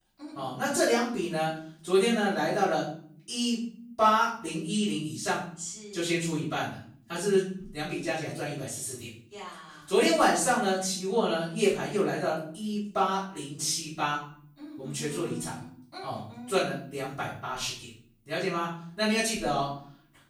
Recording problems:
off-mic speech; far
room echo; noticeable; dies away in 0.5 s

